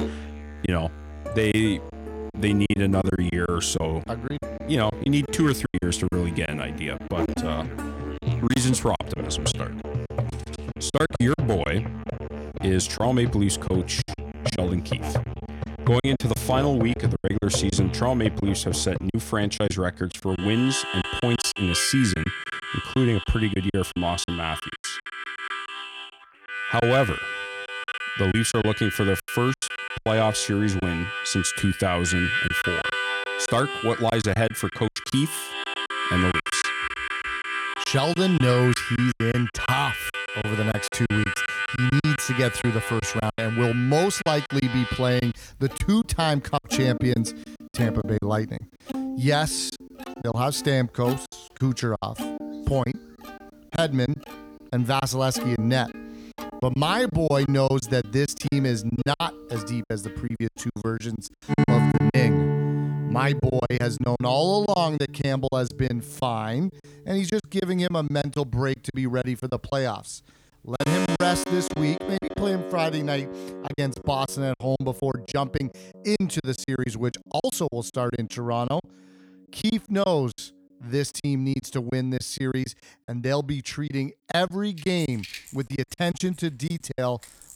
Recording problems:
background music; loud; throughout; 5 dB below the speech
choppy; very; 11% of the speech affected

